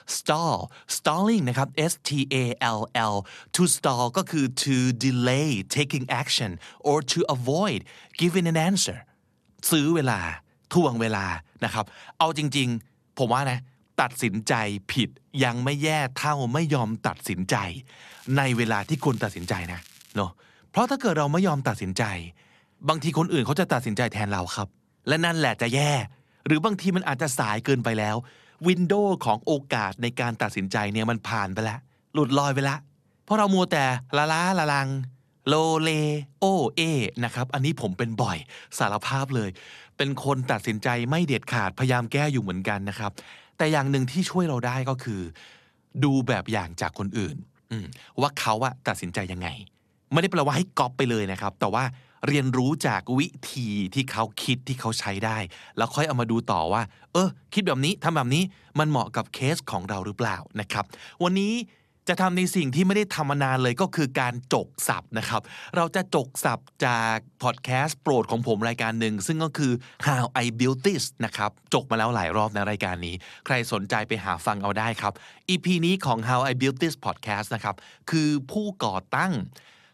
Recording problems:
crackling; faint; from 18 to 20 s; 25 dB below the speech

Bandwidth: 13.5 kHz